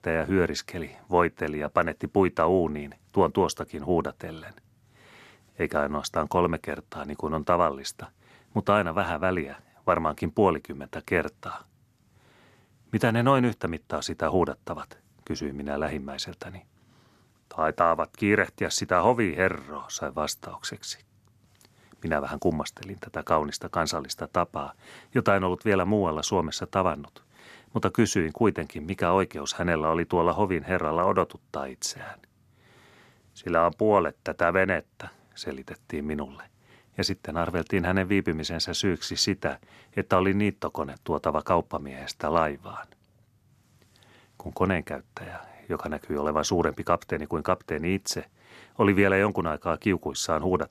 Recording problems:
none

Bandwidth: 13.5 kHz